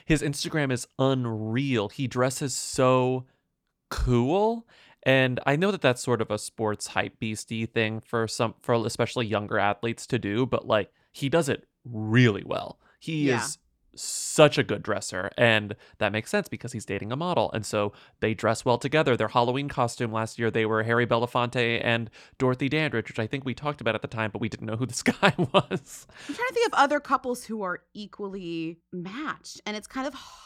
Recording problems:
none

